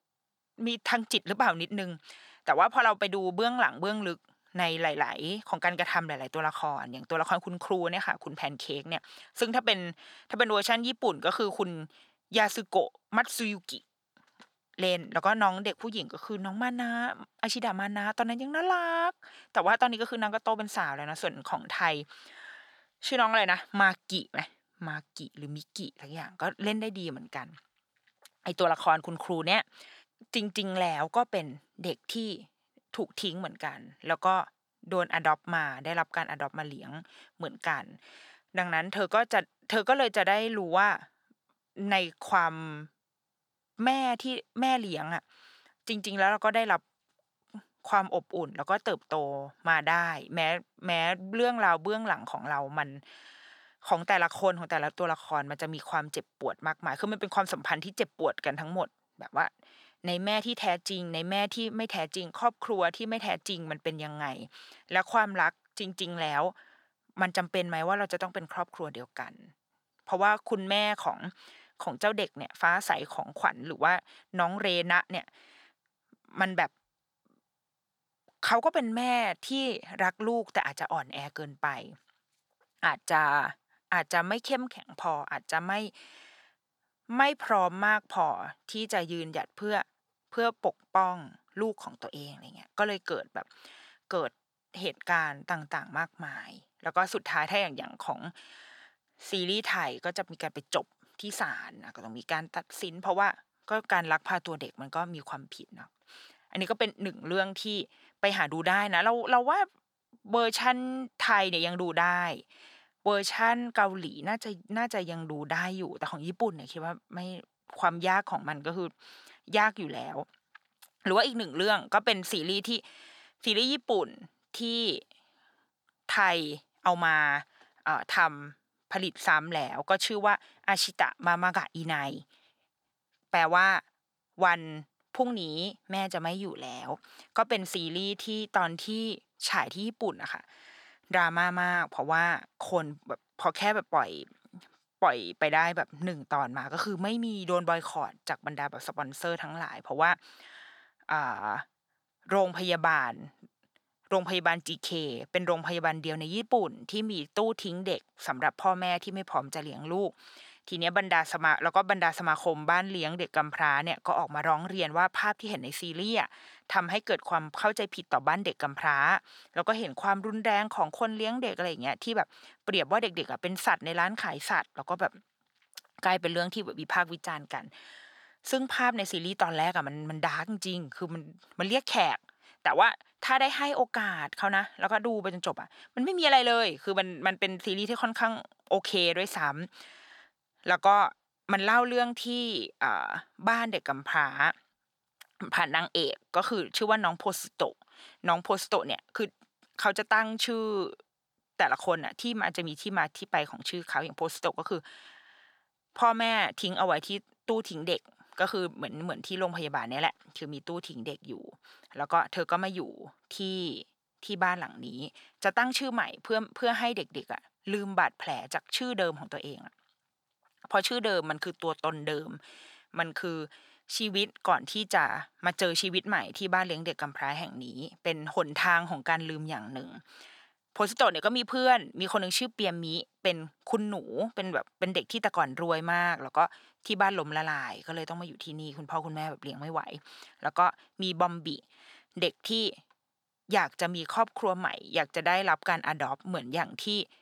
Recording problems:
thin; very slightly; fading below 750 Hz

